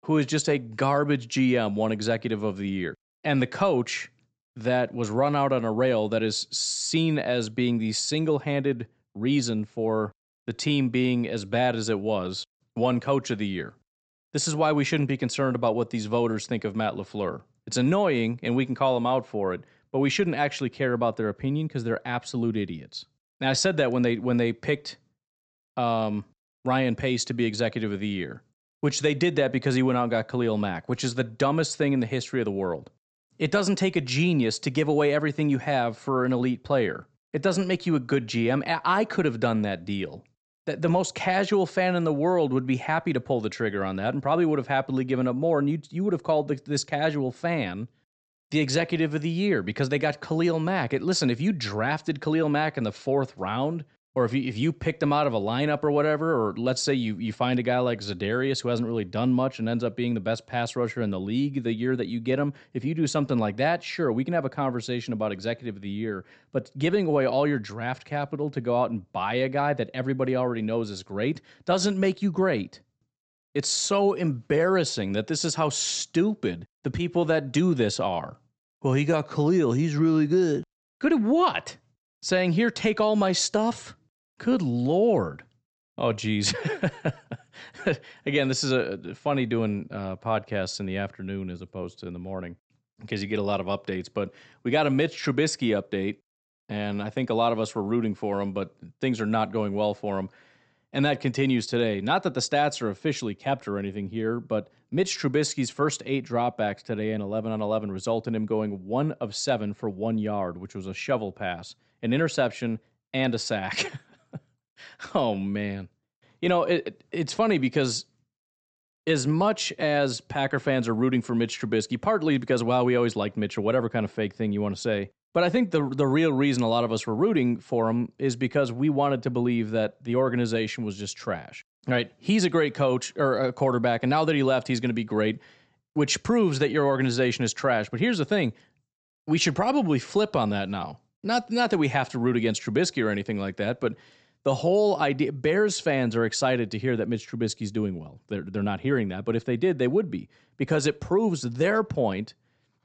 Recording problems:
high frequencies cut off; noticeable; nothing above 8 kHz

